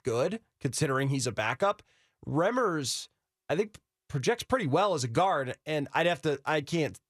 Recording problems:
none

